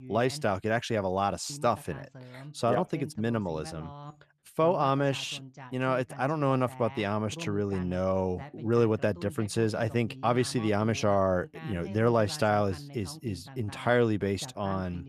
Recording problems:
voice in the background; noticeable; throughout; 15 dB below the speech

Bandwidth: 13.5 kHz